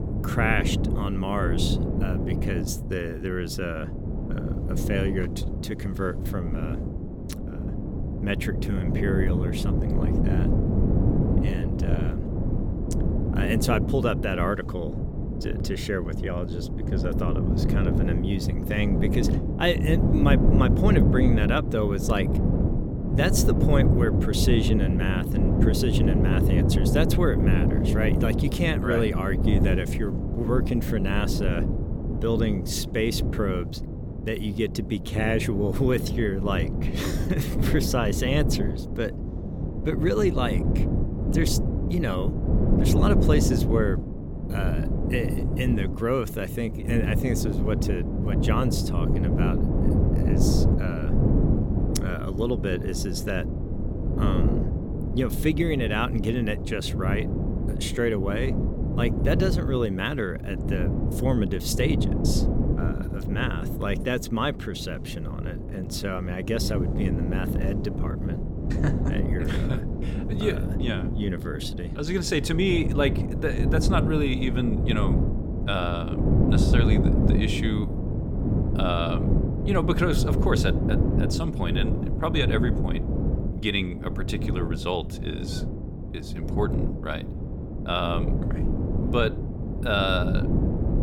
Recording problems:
wind noise on the microphone; heavy; 4 dB below the speech

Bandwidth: 17 kHz